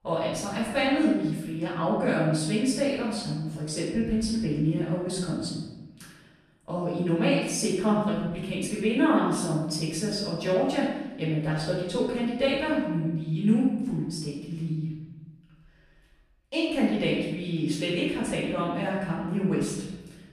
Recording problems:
off-mic speech; far
room echo; noticeable; dies away in 1 s

